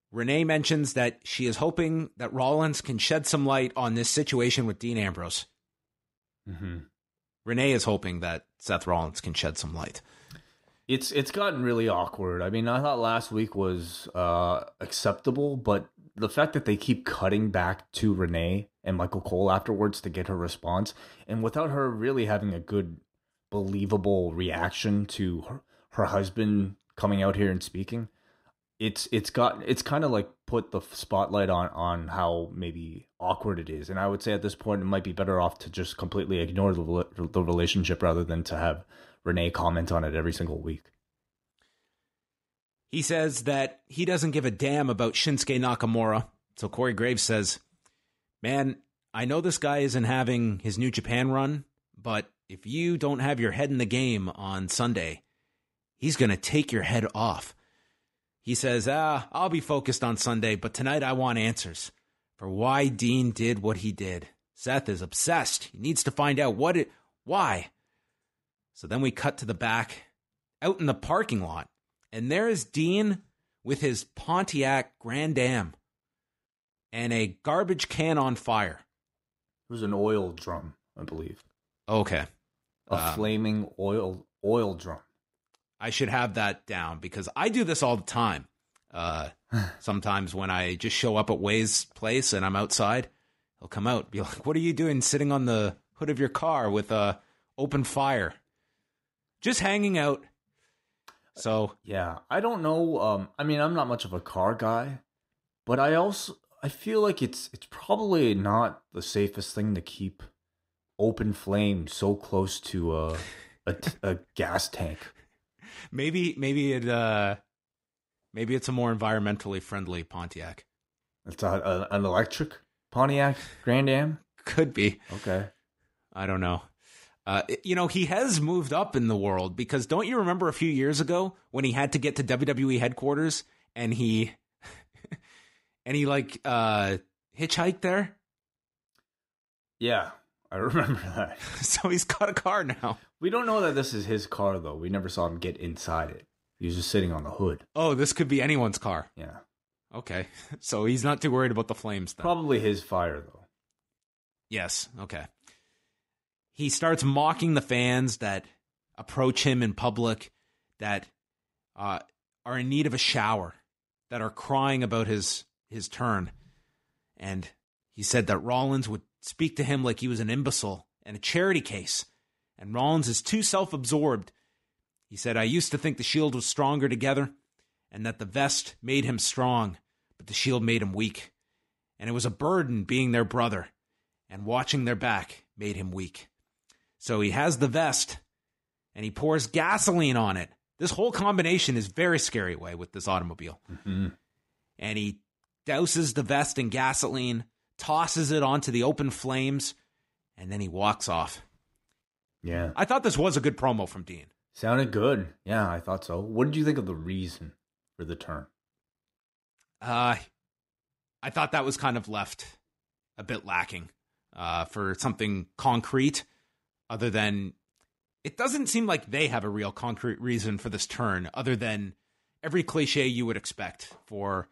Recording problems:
none

